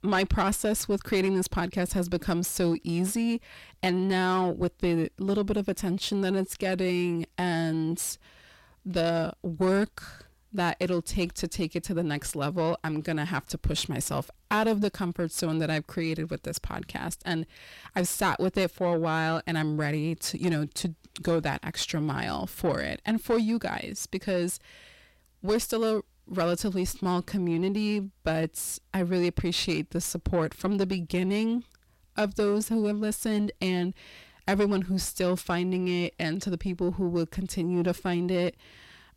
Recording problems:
distortion; slight; 10 dB below the speech

